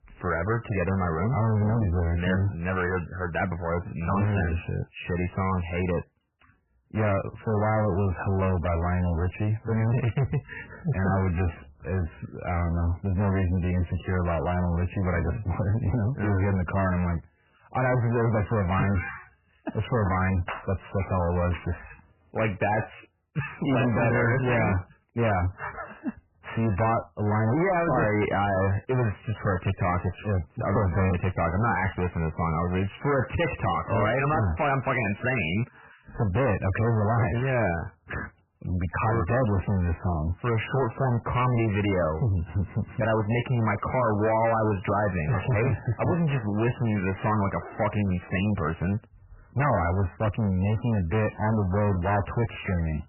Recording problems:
distortion; heavy; 5 dB below the speech
garbled, watery; badly; nothing above 3 kHz

